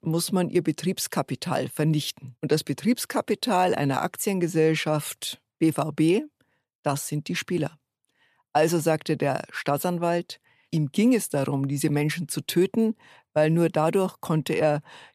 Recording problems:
none

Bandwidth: 14.5 kHz